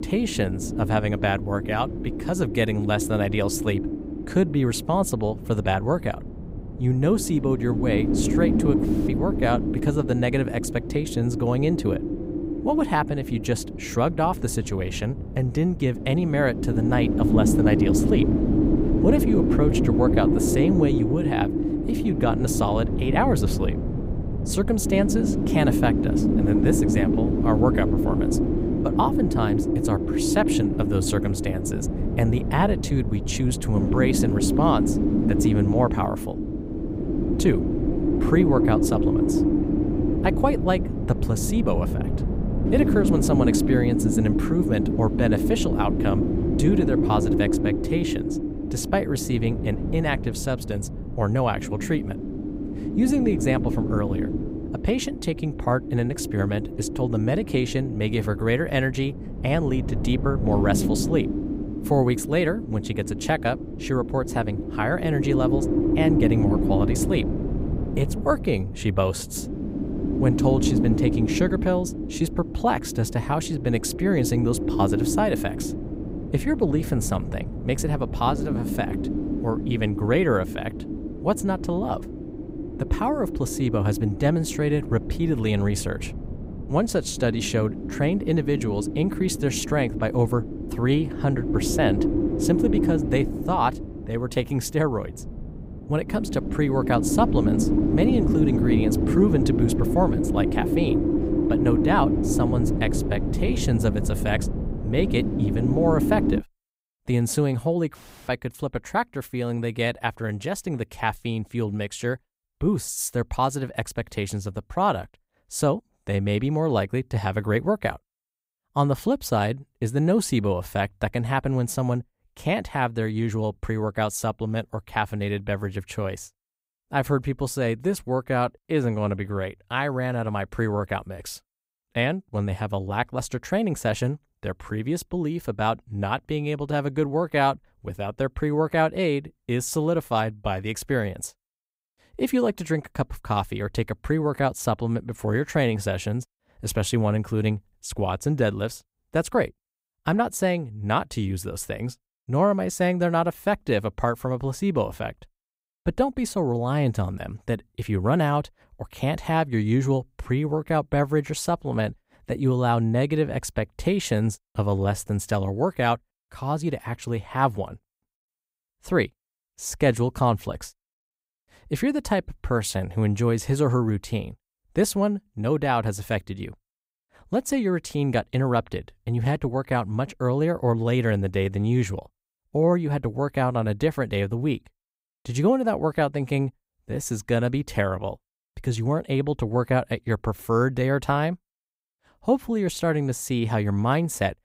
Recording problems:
wind noise on the microphone; heavy; until 1:46; 3 dB below the speech

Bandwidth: 15.5 kHz